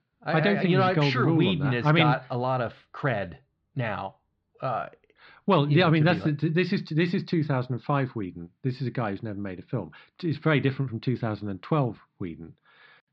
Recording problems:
muffled; very slightly; fading above 4 kHz

